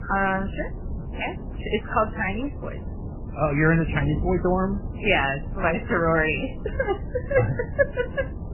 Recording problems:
garbled, watery; badly; nothing above 3 kHz
wind noise on the microphone; occasional gusts; 20 dB below the speech

